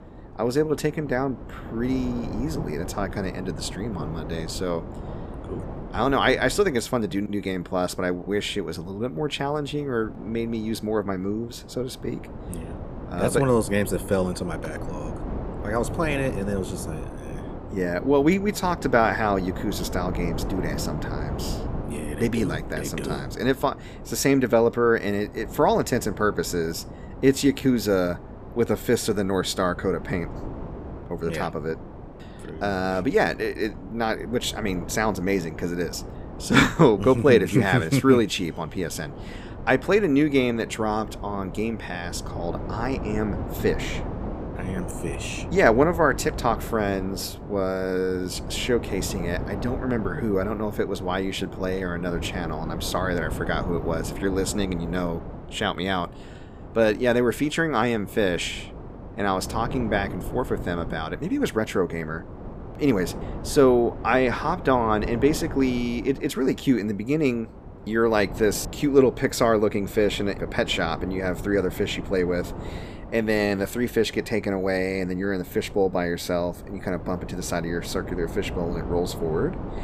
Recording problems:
wind noise on the microphone; occasional gusts; 15 dB below the speech

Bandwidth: 14.5 kHz